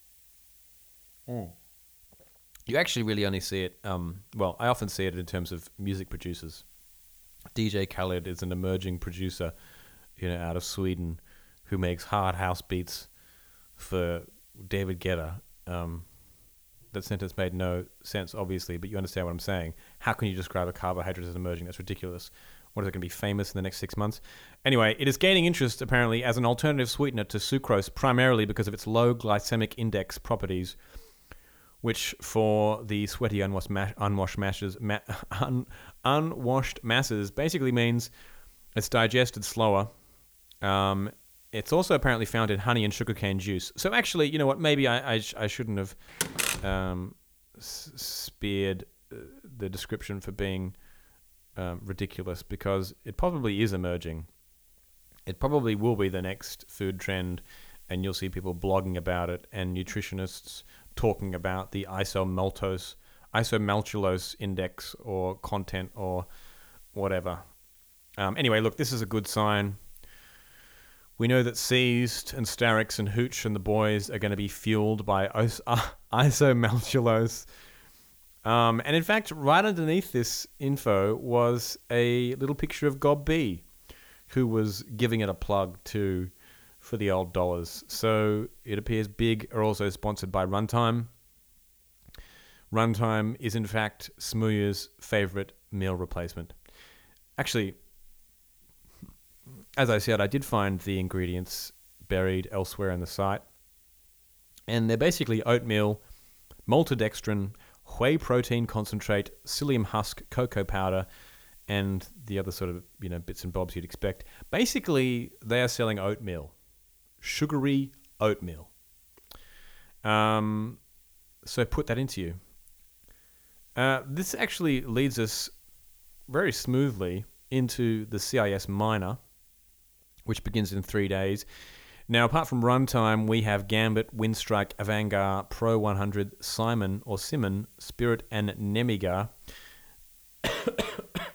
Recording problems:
hiss; faint; throughout; 25 dB below the speech
door banging; loud; at 46 s; peak 1 dB above the speech

